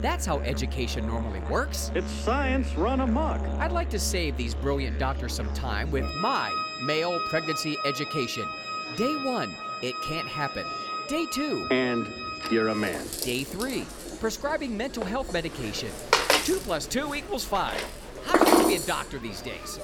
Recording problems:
background music; loud; throughout; as loud as the speech
murmuring crowd; noticeable; throughout; 15 dB below the speech

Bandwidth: 18 kHz